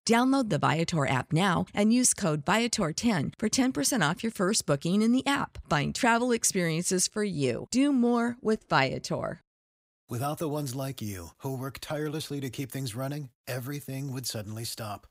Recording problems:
none

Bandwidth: 15.5 kHz